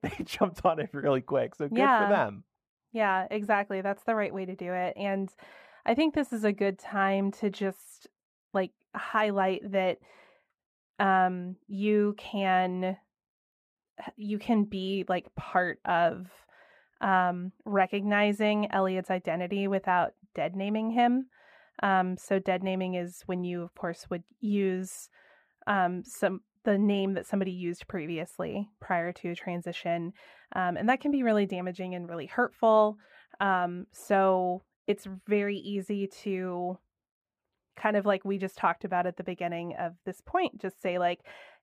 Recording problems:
muffled; very; fading above 3.5 kHz

